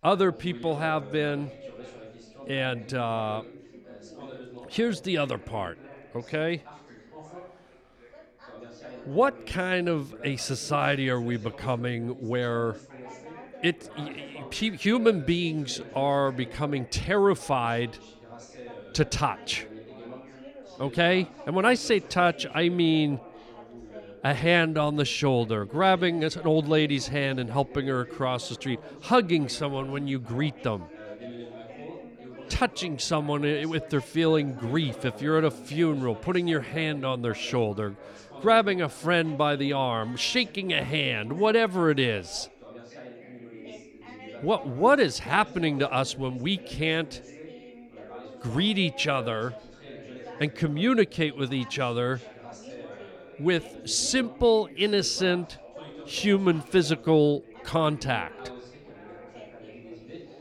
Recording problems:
background chatter; noticeable; throughout; 3 voices, 20 dB below the speech

